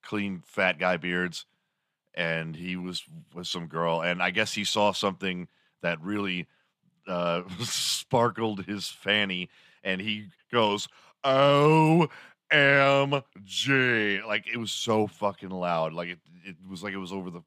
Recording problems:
none

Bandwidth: 14.5 kHz